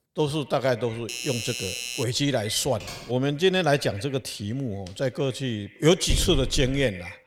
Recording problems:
echo of what is said; faint; throughout; 120 ms later, 20 dB below the speech
doorbell; noticeable; from 1 to 2 s; peak 4 dB below the speech
keyboard typing; faint; at 2.5 s; peak 15 dB below the speech
dog barking; noticeable; at 6 s; peak 4 dB below the speech

